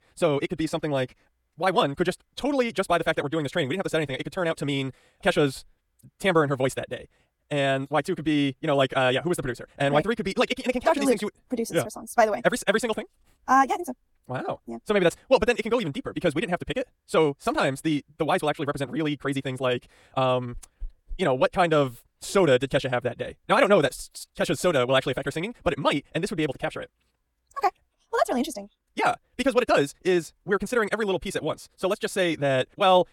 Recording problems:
wrong speed, natural pitch; too fast; 1.8 times normal speed

